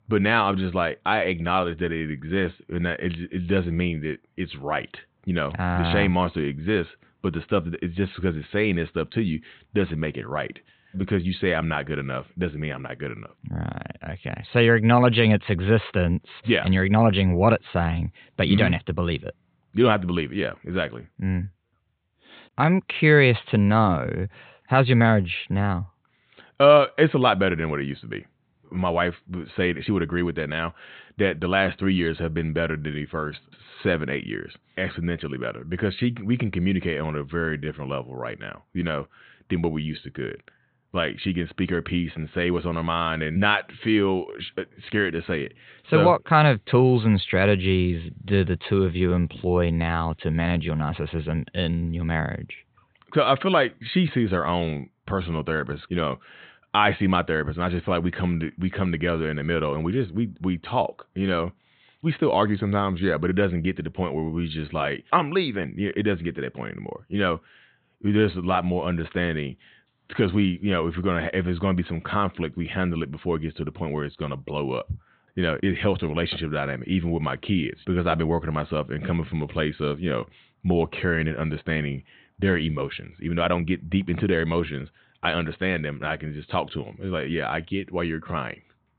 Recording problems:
high frequencies cut off; severe; nothing above 4 kHz

